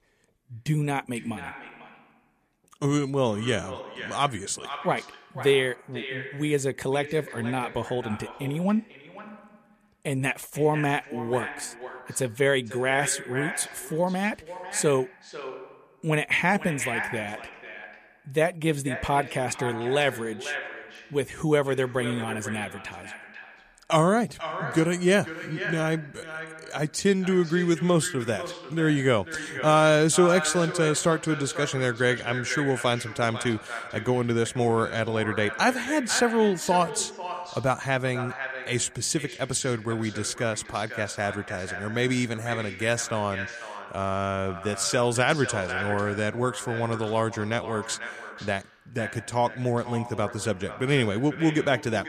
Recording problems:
echo of what is said; strong; throughout; 490 ms later, 10 dB below the speech

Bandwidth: 14.5 kHz